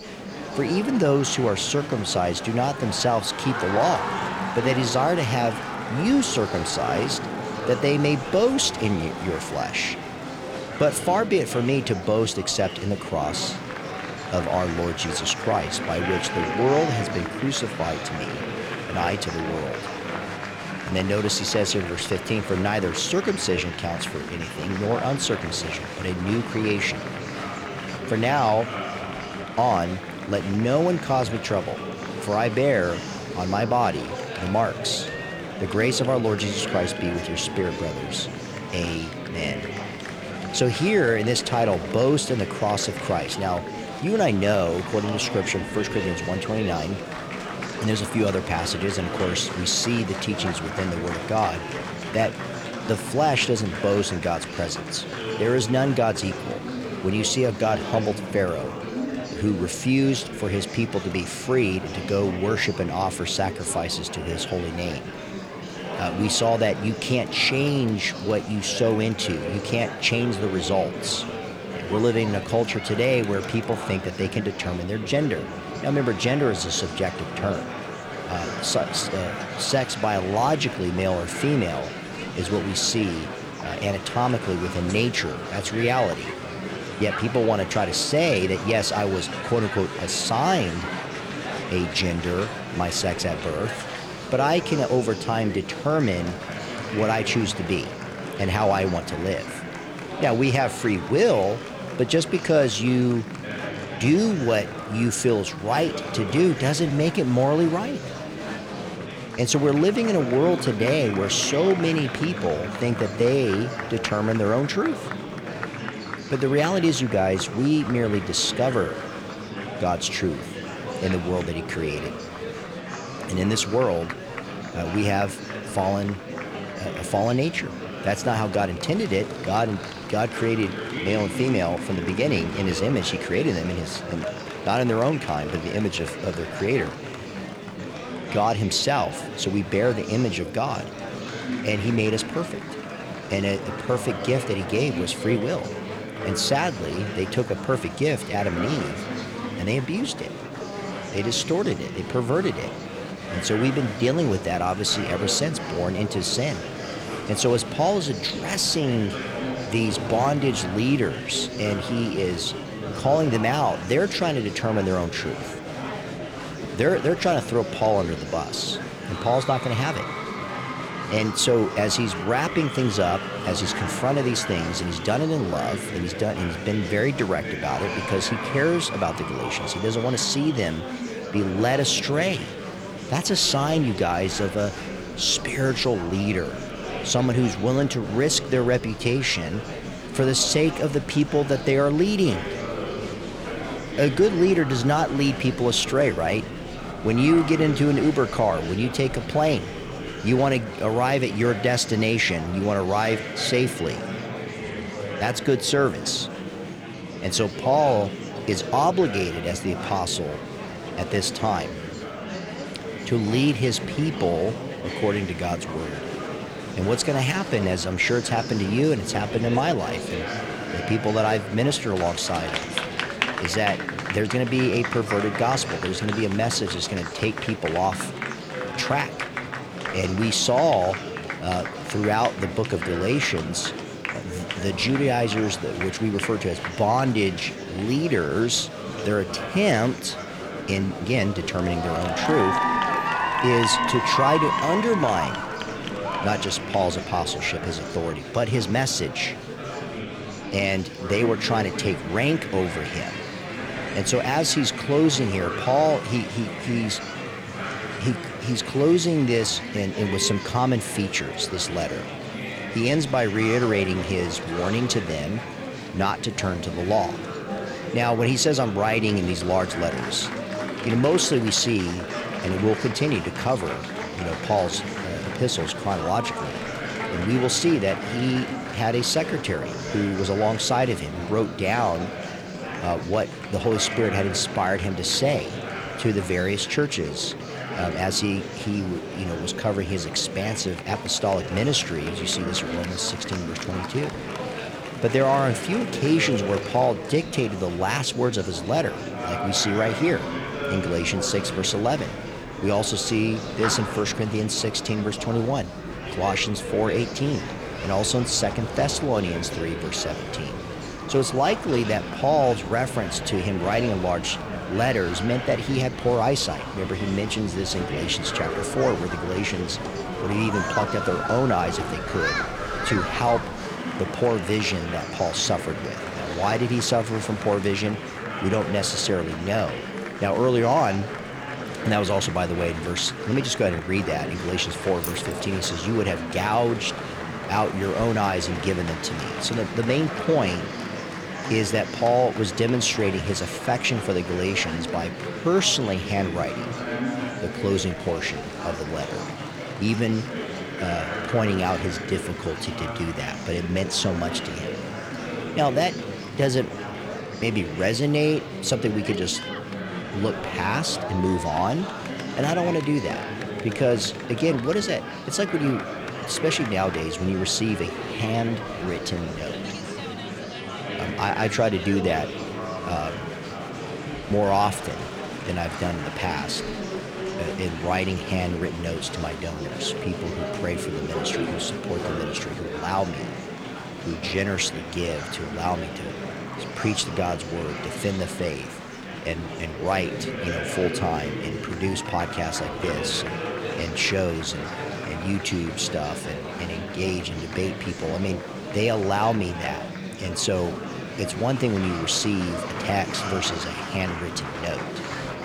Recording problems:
murmuring crowd; loud; throughout; 7 dB below the speech
jangling keys; noticeable; at 5:35; peak 9 dB below the speech

